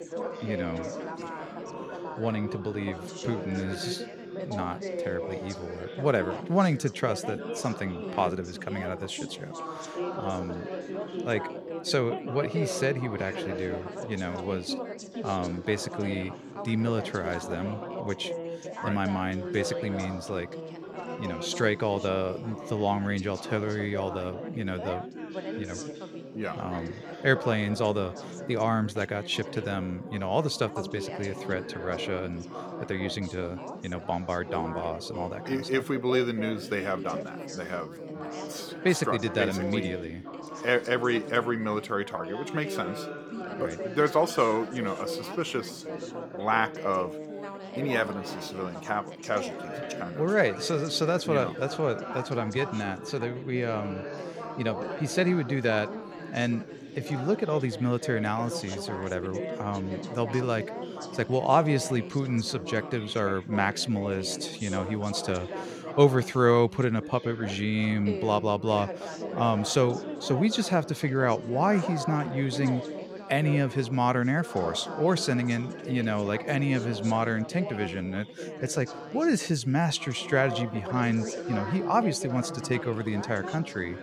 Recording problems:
background chatter; loud; throughout; 4 voices, 9 dB below the speech

